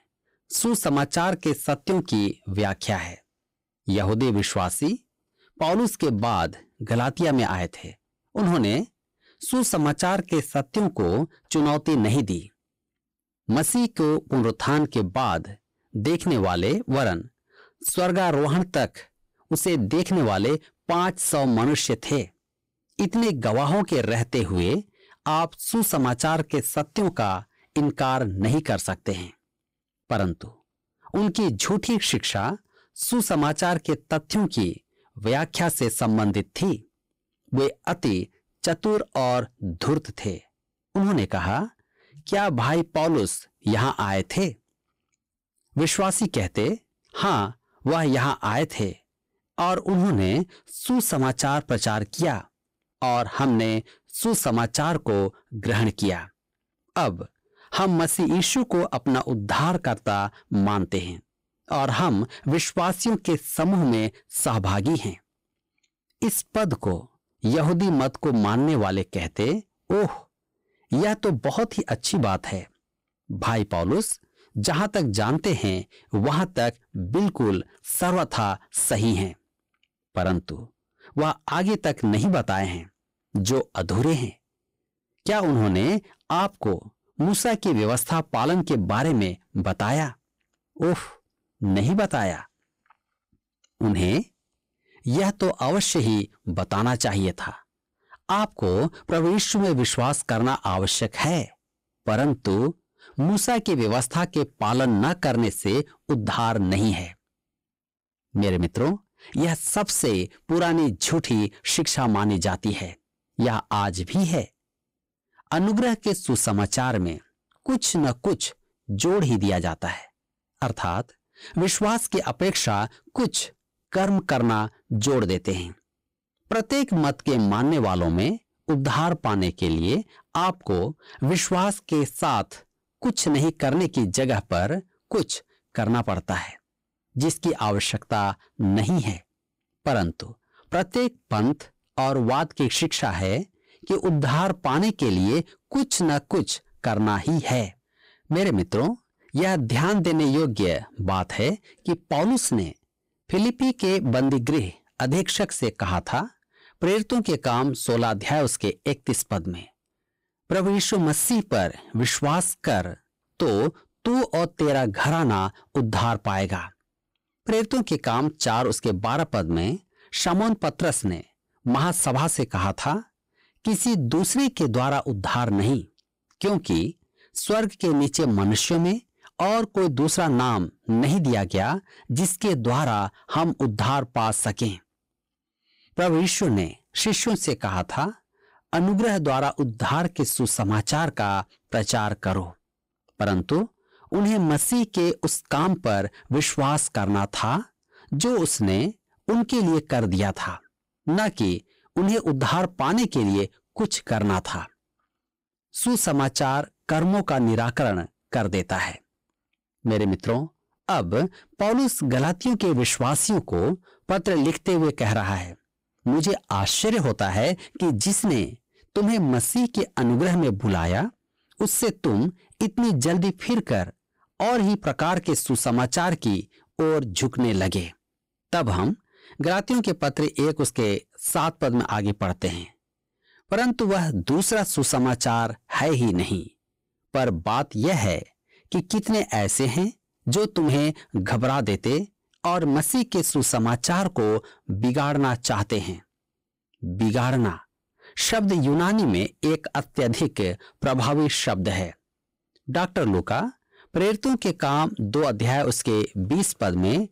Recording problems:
distortion; slight; 13% of the sound clipped

